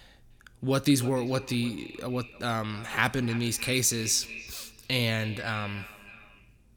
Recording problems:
echo of what is said; noticeable; throughout; 300 ms later, 15 dB below the speech

